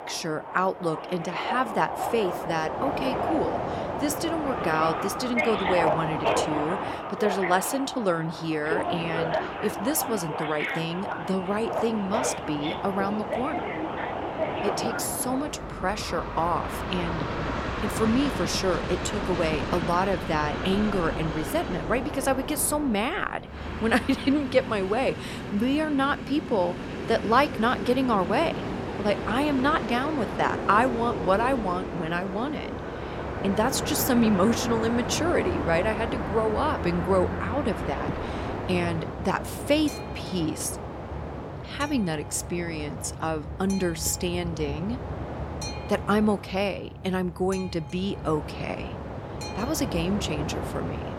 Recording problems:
train or aircraft noise; loud; throughout; 4 dB below the speech

